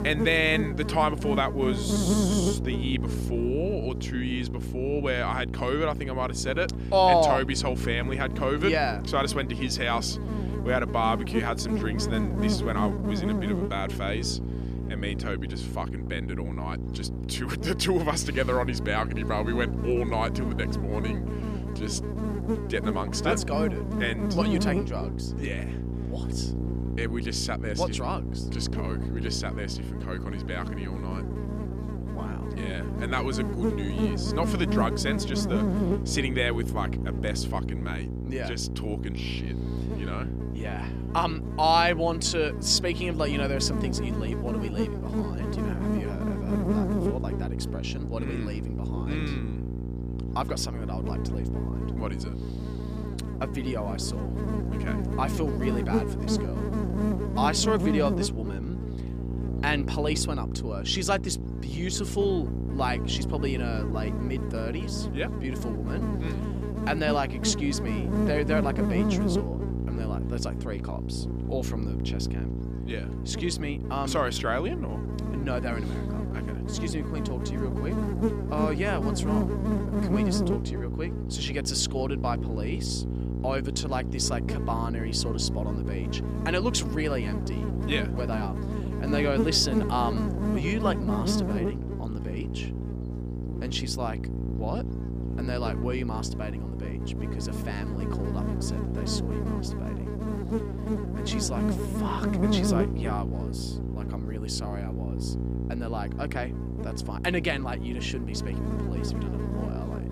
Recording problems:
electrical hum; loud; throughout; 60 Hz, 7 dB below the speech

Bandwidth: 15 kHz